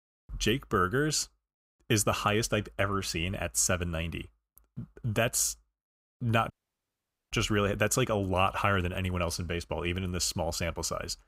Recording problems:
audio cutting out; at 6.5 s for 1 s

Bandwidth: 15.5 kHz